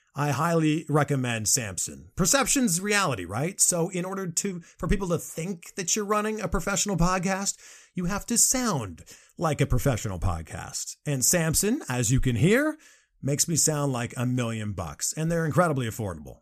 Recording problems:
none

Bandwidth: 14.5 kHz